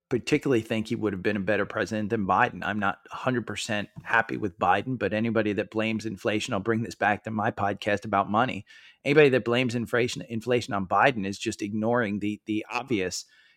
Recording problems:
none

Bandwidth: 16.5 kHz